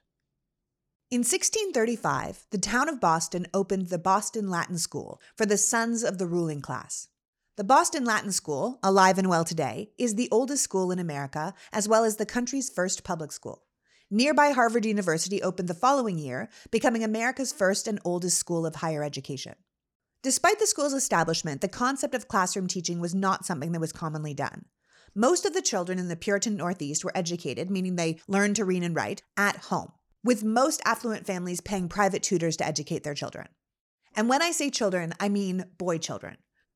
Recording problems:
none

